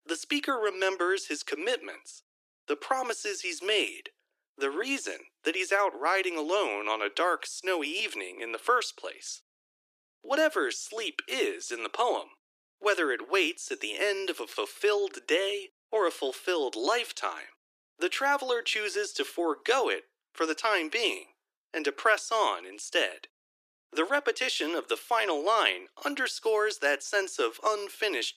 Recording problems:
thin; very; fading below 300 Hz

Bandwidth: 14.5 kHz